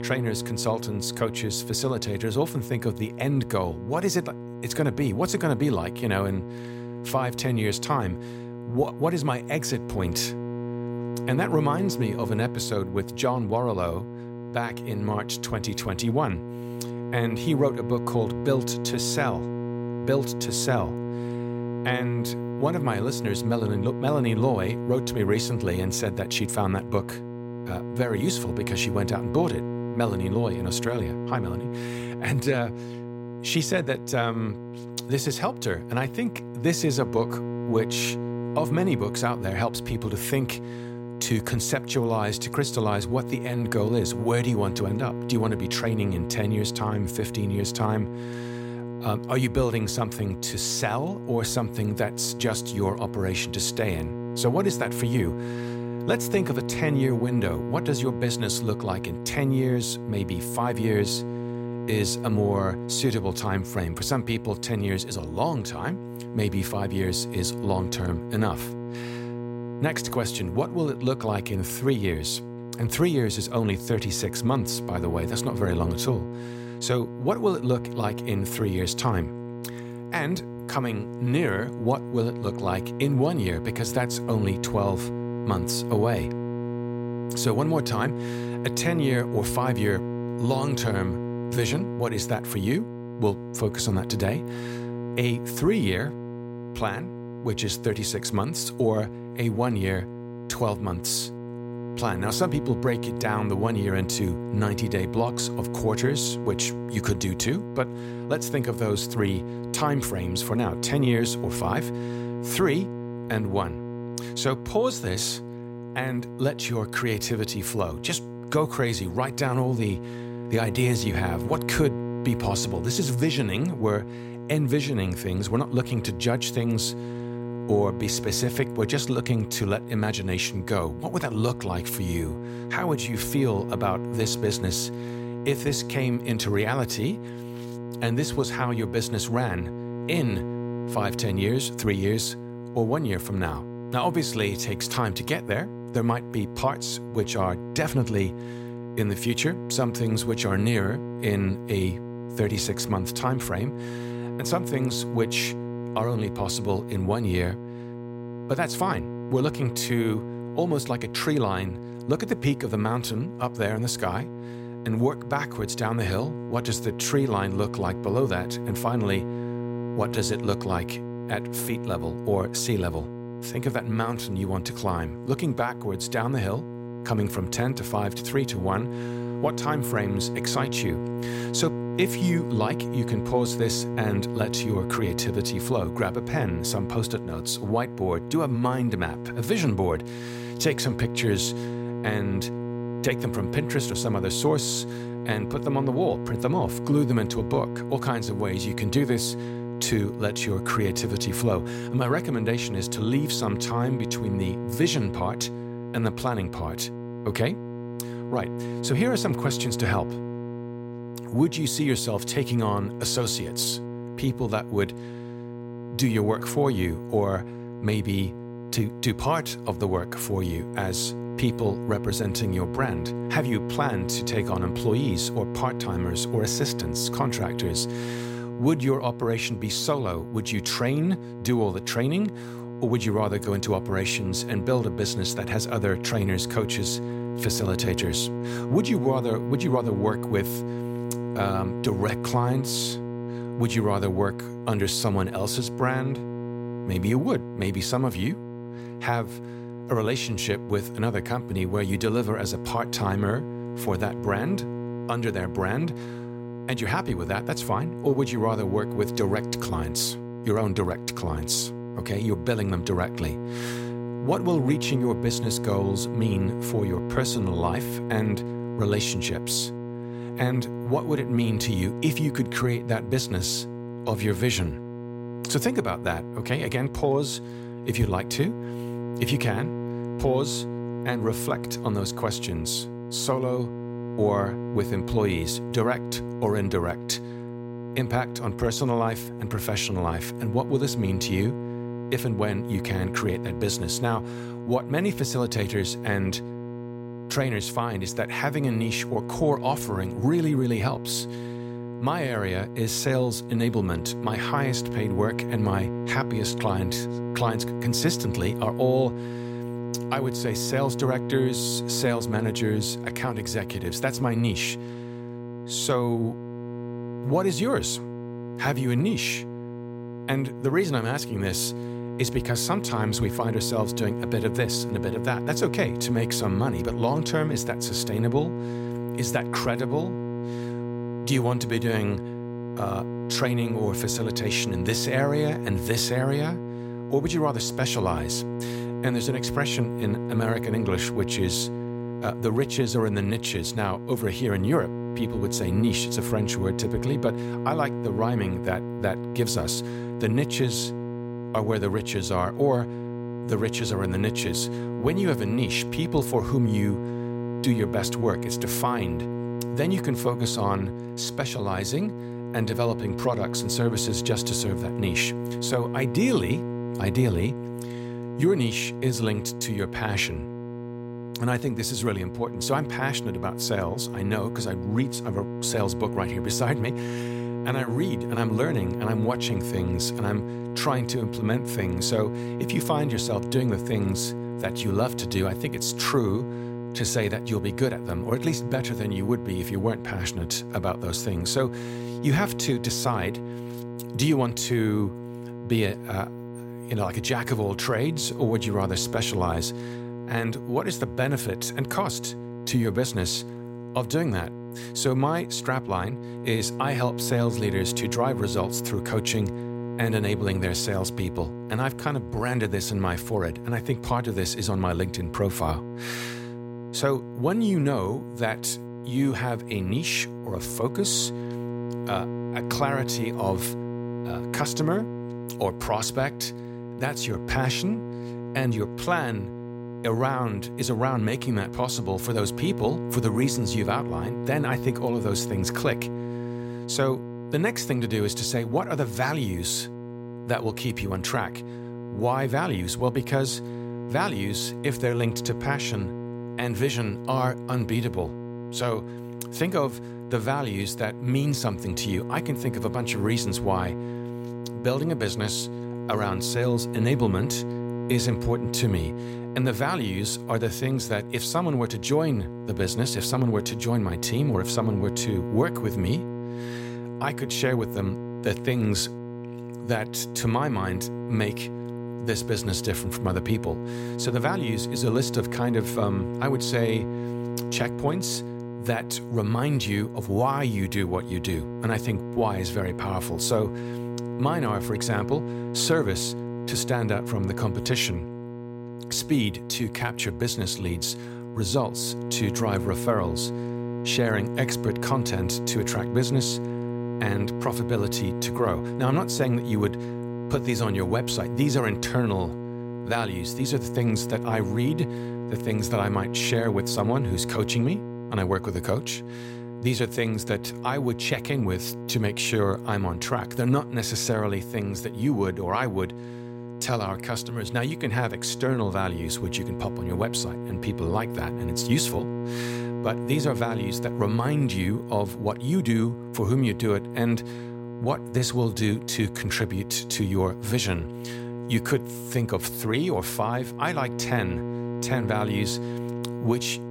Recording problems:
electrical hum; loud; throughout; 60 Hz, 8 dB below the speech

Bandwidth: 16 kHz